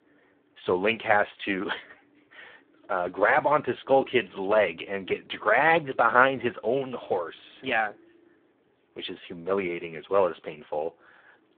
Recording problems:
phone-call audio; poor line

